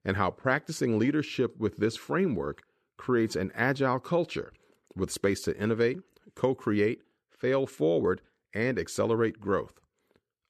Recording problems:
none

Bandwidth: 14 kHz